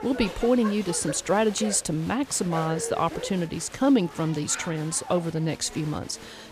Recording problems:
crowd noise; noticeable; throughout; 15 dB below the speech

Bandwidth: 14.5 kHz